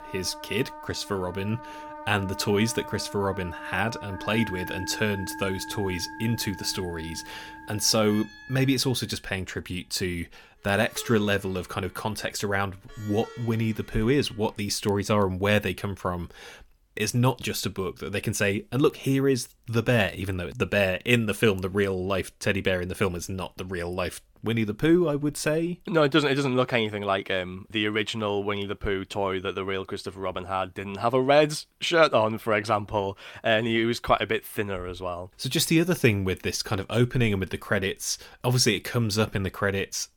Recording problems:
background music; noticeable; until 14 s; 15 dB below the speech

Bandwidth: 17.5 kHz